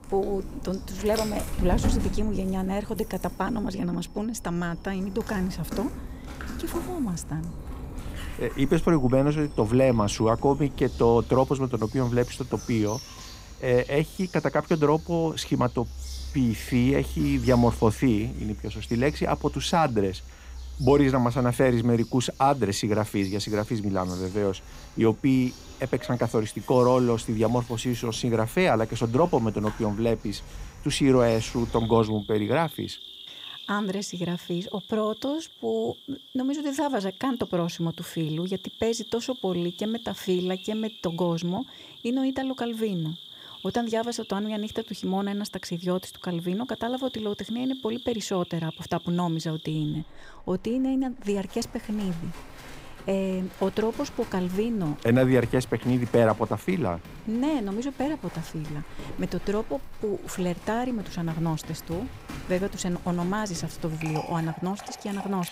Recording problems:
animal sounds; noticeable; throughout; 15 dB below the speech

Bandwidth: 15.5 kHz